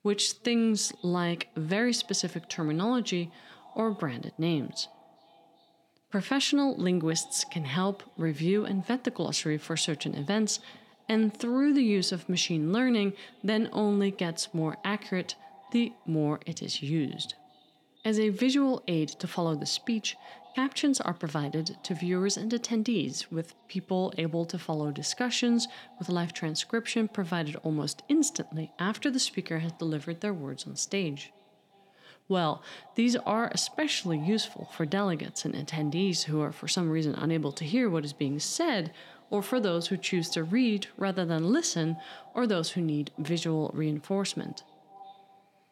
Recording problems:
echo of what is said; faint; throughout; 390 ms later, 25 dB below the speech

